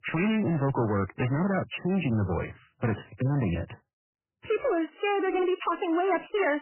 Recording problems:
garbled, watery; badly; nothing above 3 kHz
distortion; slight; 10 dB below the speech

